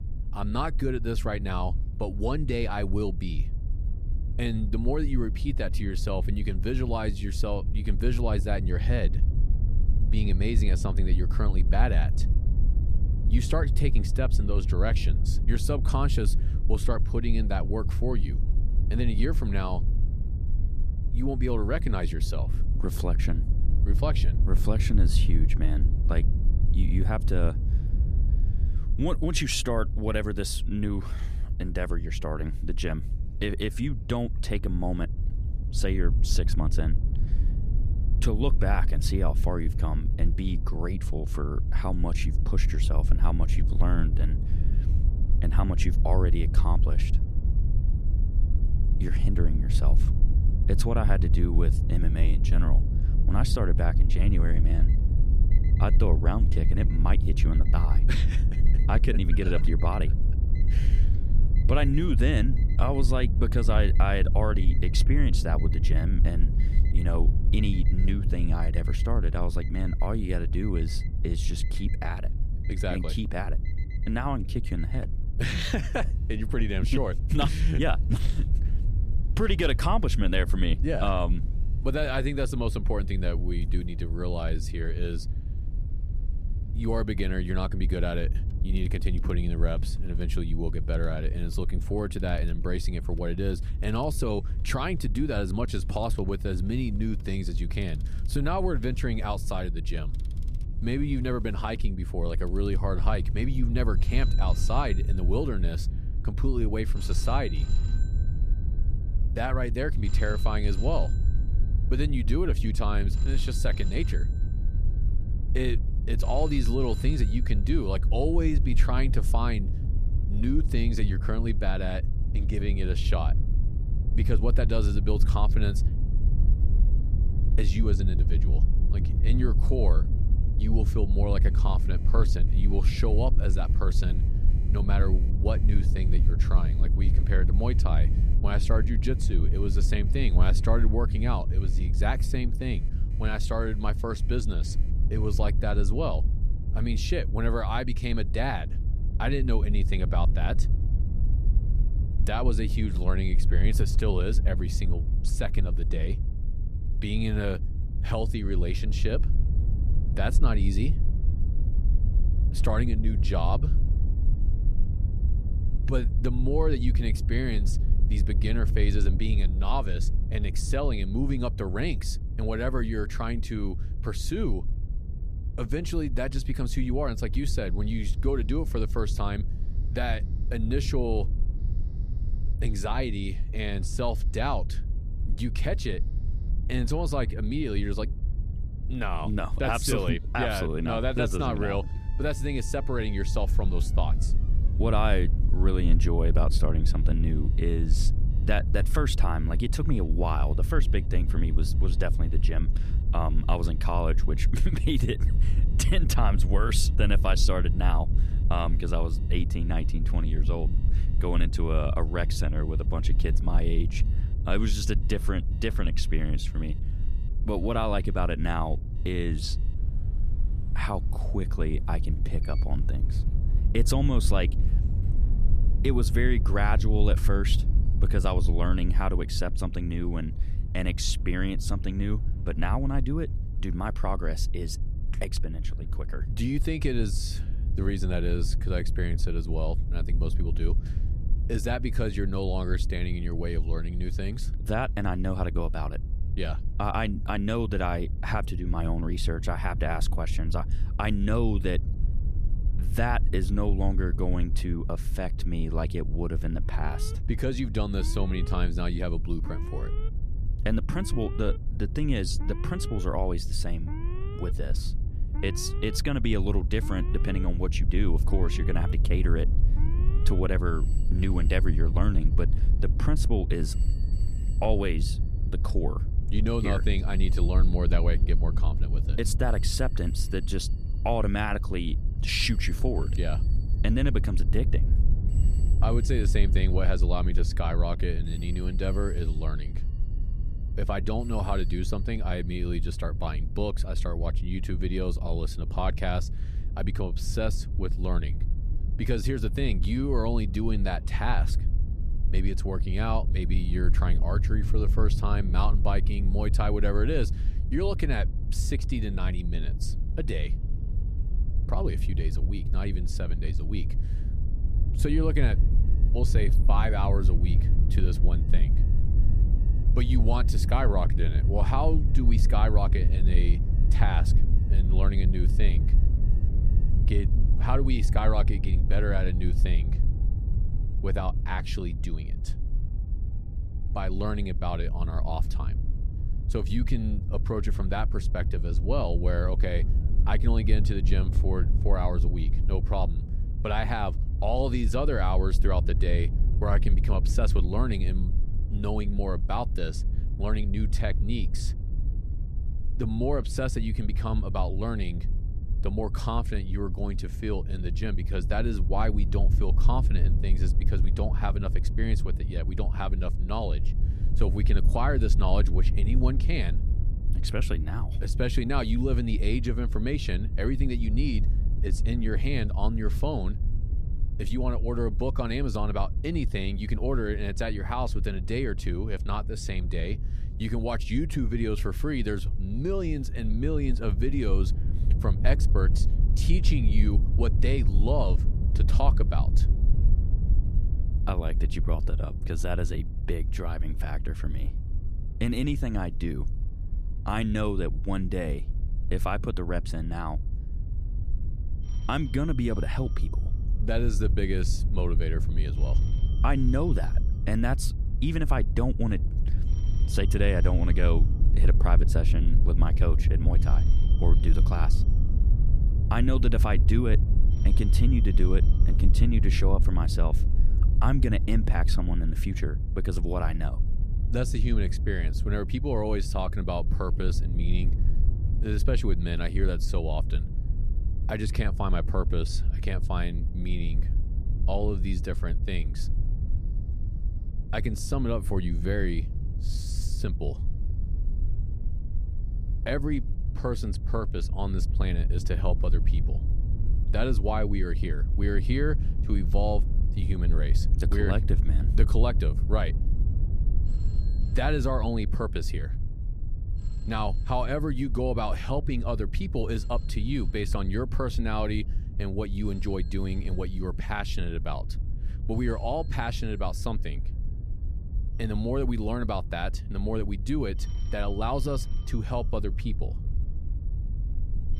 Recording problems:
low rumble; noticeable; throughout; 10 dB below the speech
alarms or sirens; faint; throughout; 25 dB below the speech

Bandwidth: 14.5 kHz